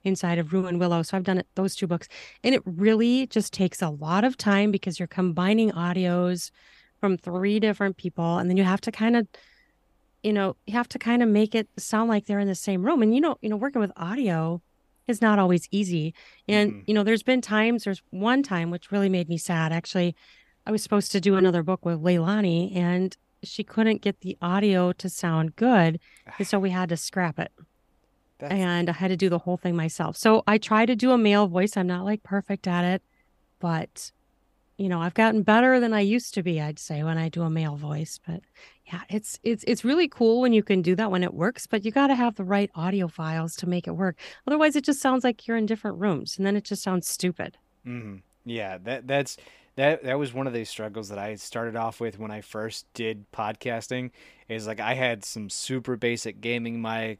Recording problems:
none

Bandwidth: 15 kHz